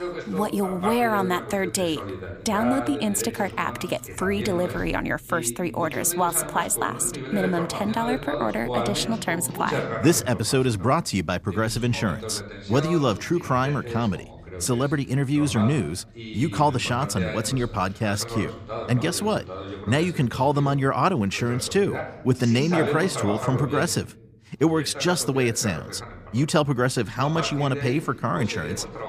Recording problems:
voice in the background; loud; throughout; 9 dB below the speech

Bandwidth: 15 kHz